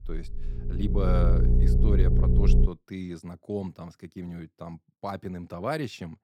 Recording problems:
low rumble; loud; until 2.5 s; 1 dB below the speech

